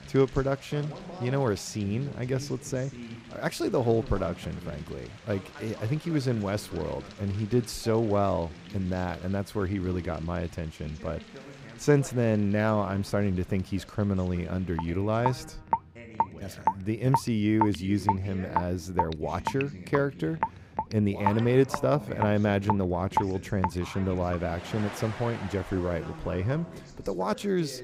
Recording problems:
rain or running water; loud; throughout; 5 dB below the speech
voice in the background; noticeable; throughout; 15 dB below the speech

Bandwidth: 15.5 kHz